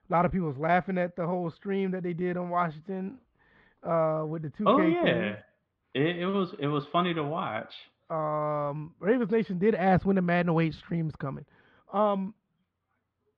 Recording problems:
muffled; slightly; fading above 3.5 kHz

